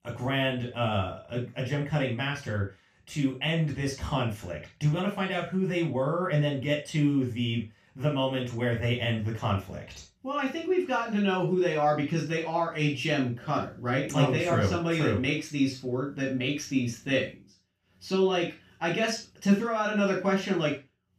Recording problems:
off-mic speech; far
room echo; noticeable; dies away in 0.3 s

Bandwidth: 15 kHz